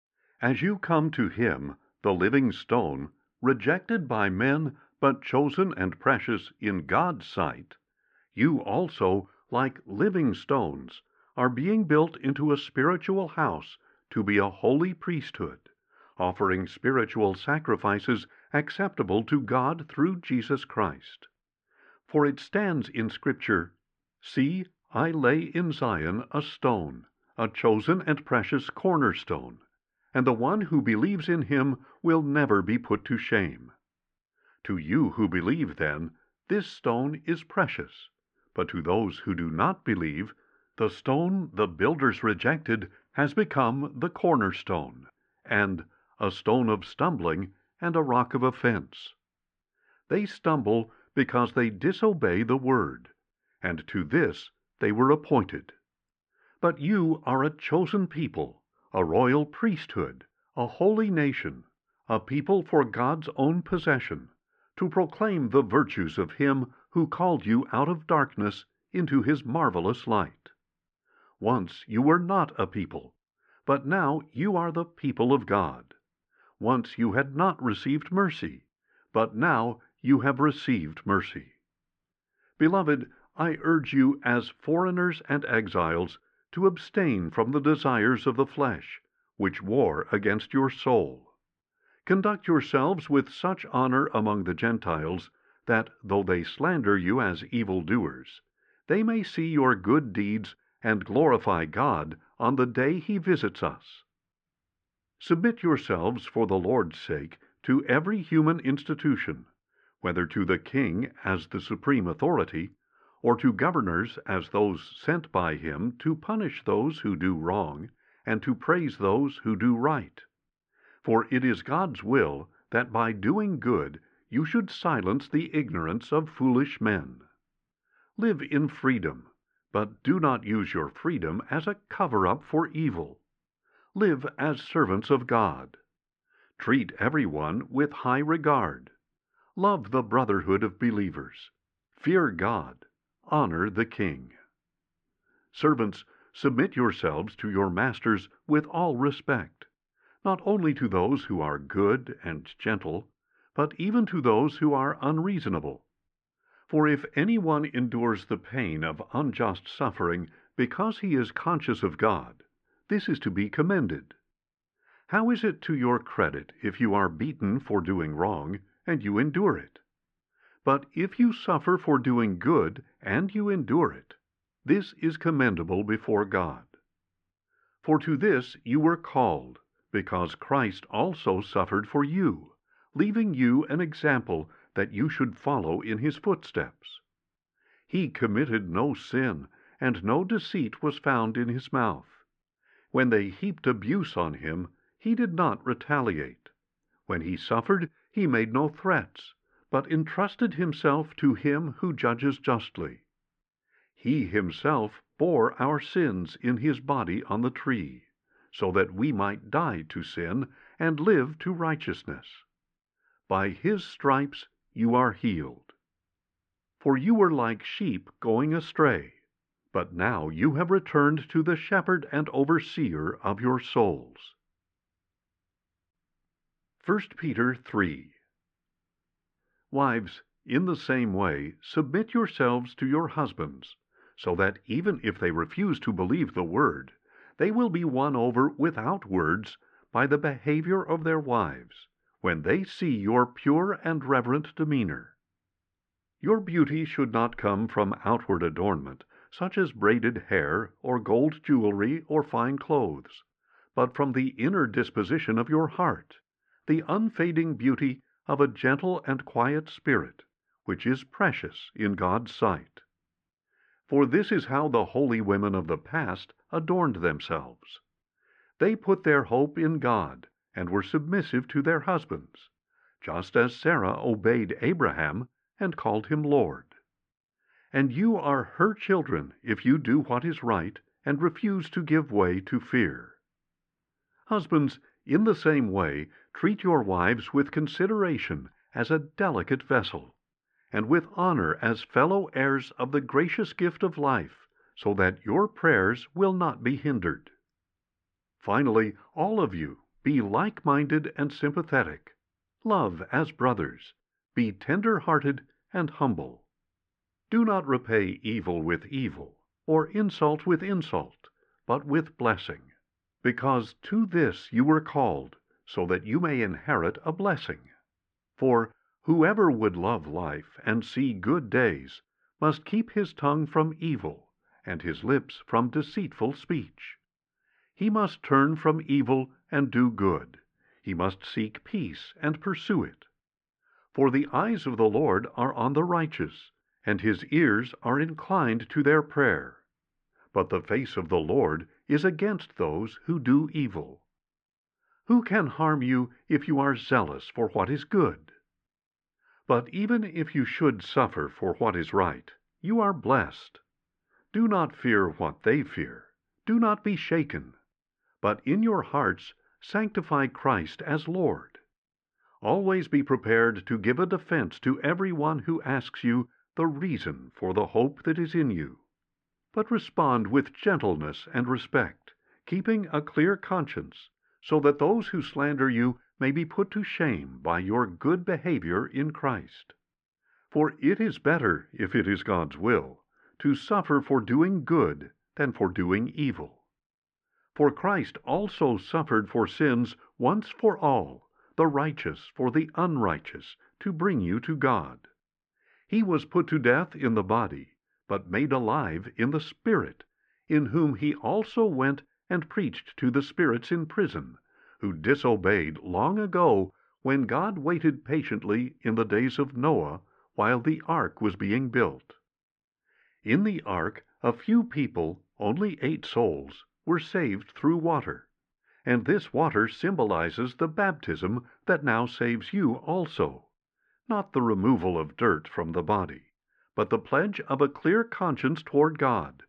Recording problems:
muffled; very; fading above 2.5 kHz

